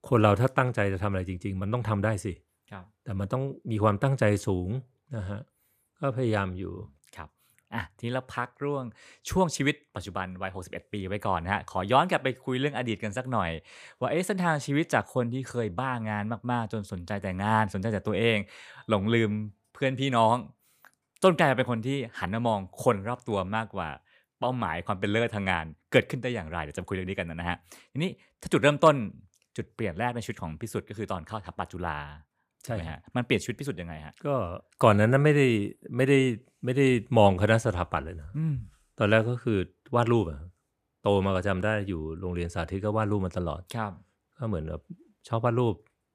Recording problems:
none

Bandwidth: 15 kHz